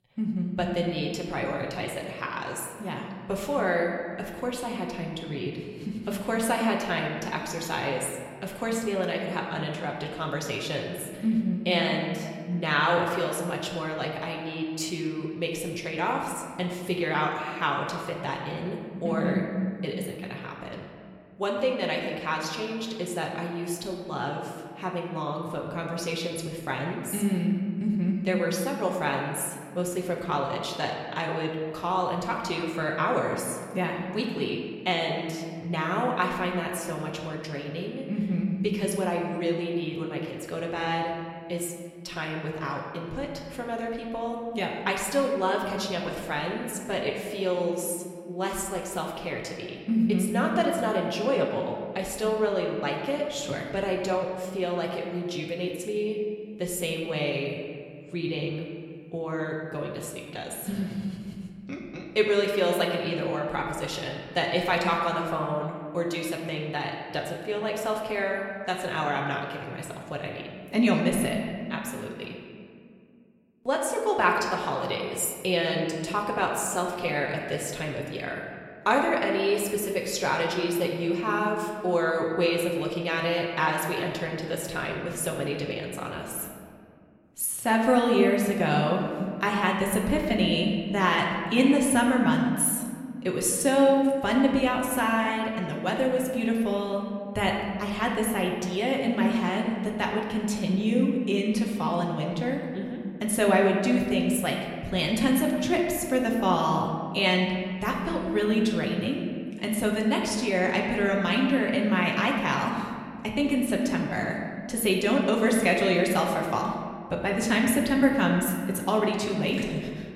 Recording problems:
room echo; noticeable; dies away in 1.8 s
off-mic speech; somewhat distant

